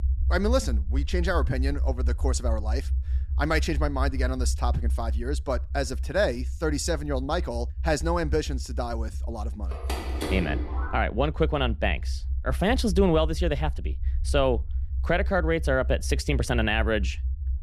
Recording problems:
low rumble; faint; throughout; 20 dB below the speech
phone ringing; noticeable; from 9.5 to 11 s; peak 4 dB below the speech

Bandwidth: 13.5 kHz